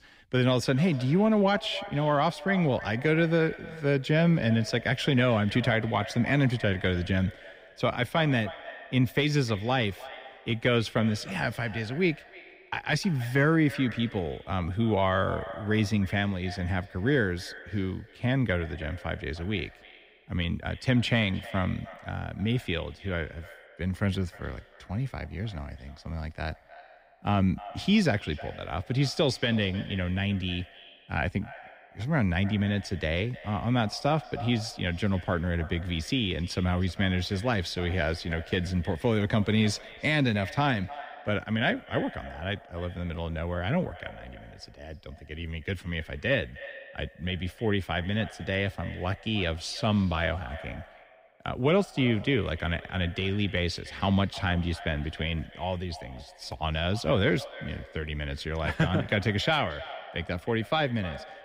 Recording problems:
echo of what is said; noticeable; throughout; 310 ms later, 15 dB below the speech

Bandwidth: 15.5 kHz